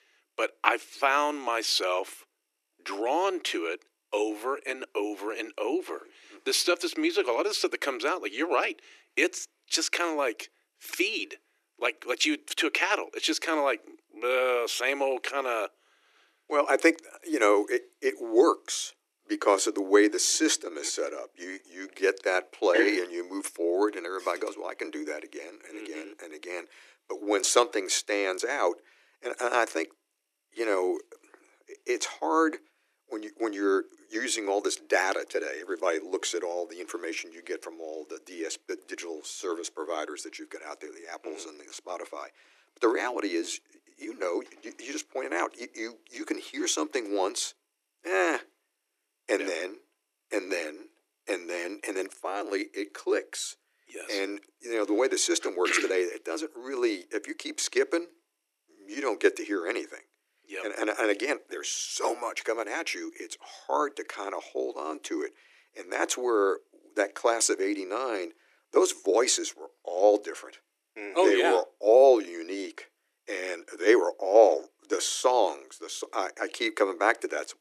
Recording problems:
thin; very; fading below 300 Hz

